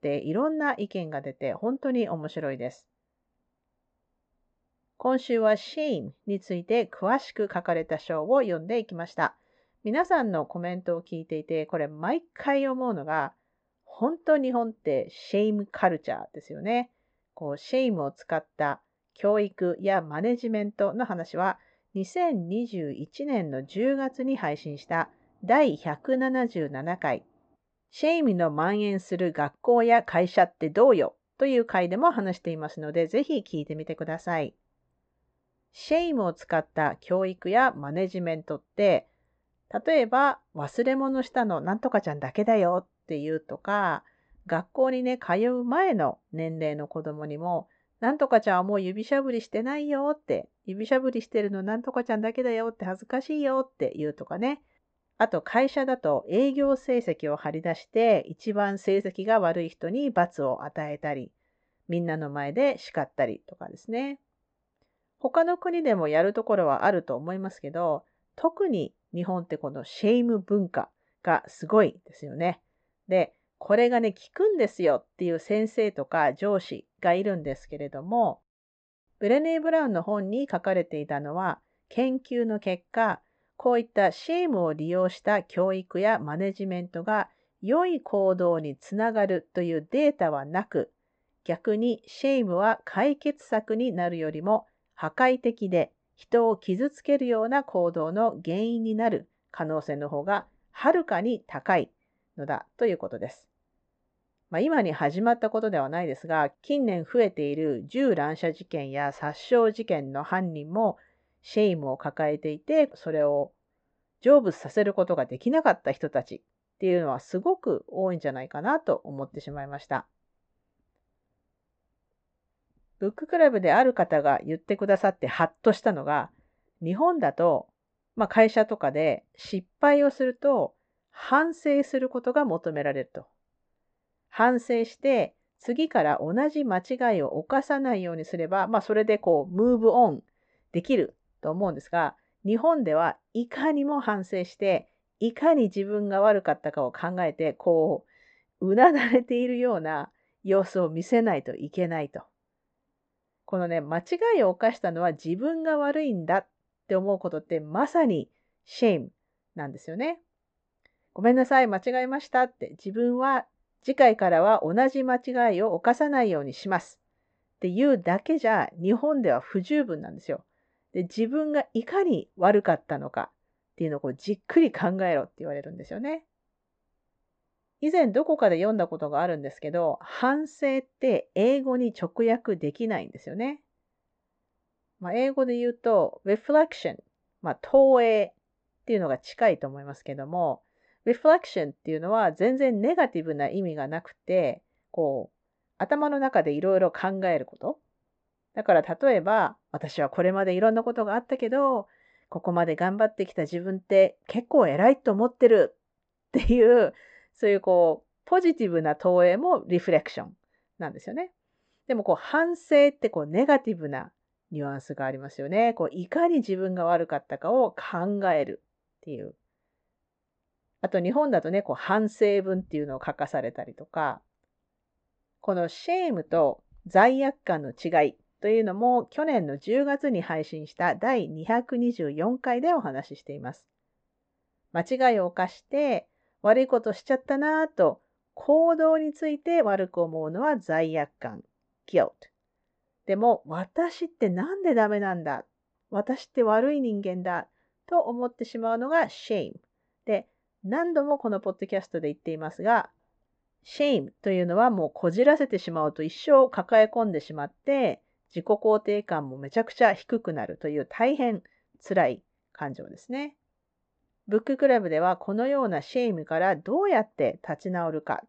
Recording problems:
muffled; very; fading above 3 kHz
high frequencies cut off; noticeable; nothing above 8 kHz

